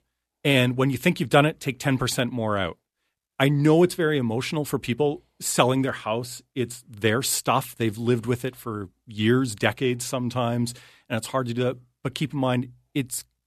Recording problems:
none

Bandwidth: 13.5 kHz